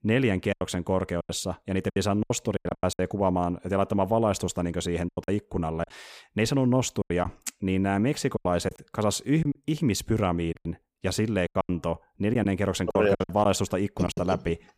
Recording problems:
choppy; very; 11% of the speech affected

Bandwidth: 15 kHz